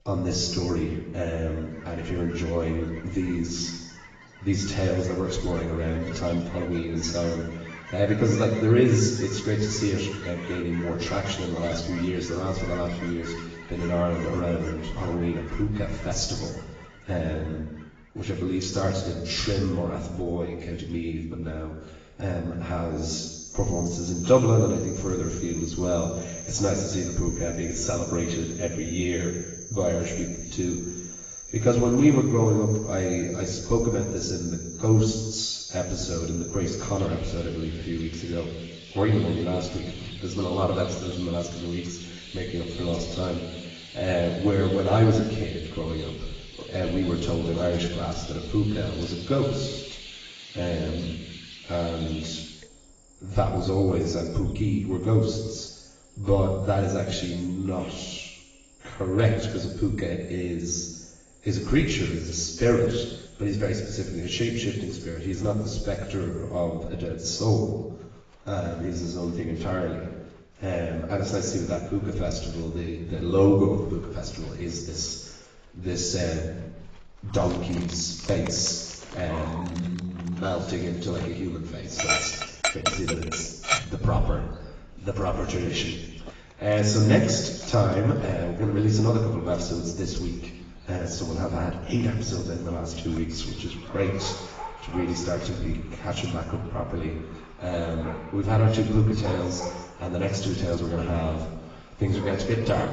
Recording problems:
off-mic speech; far
garbled, watery; badly; nothing above 7.5 kHz
room echo; noticeable; dies away in 1 s
animal sounds; noticeable; throughout; 10 dB below the speech

